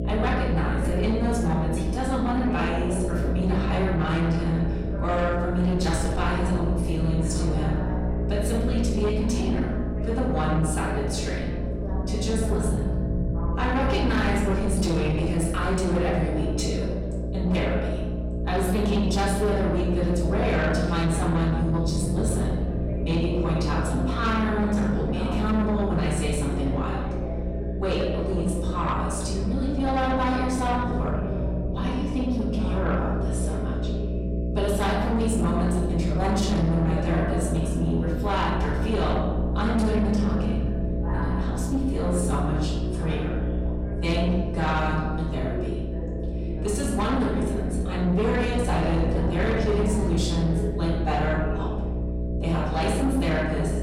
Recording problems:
off-mic speech; far
room echo; noticeable; dies away in 1 s
distortion; slight; 10 dB below the speech
electrical hum; loud; throughout; 60 Hz, 8 dB below the speech
voice in the background; noticeable; throughout; 10 dB below the speech
low rumble; noticeable; throughout; 20 dB below the speech

